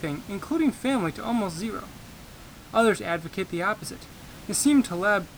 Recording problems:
hiss; noticeable; throughout; 20 dB below the speech

